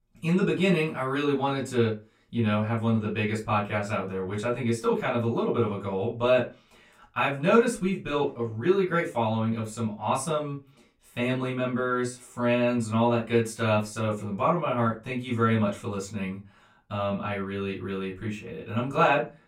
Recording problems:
off-mic speech; far
room echo; very slight; dies away in 0.2 s

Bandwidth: 16 kHz